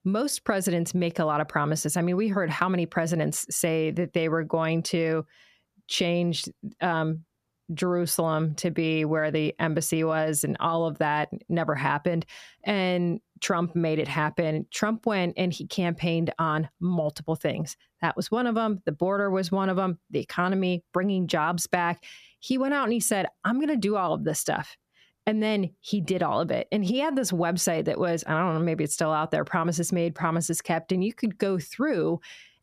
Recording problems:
none

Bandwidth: 14.5 kHz